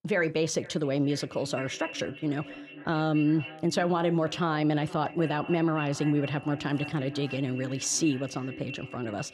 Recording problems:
echo of what is said; noticeable; throughout; 480 ms later, 15 dB below the speech

